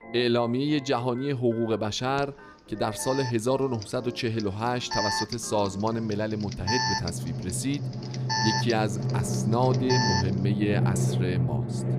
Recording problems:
background music; loud; throughout; 2 dB below the speech
alarm; loud; from 2 to 10 s; peak 2 dB above the speech

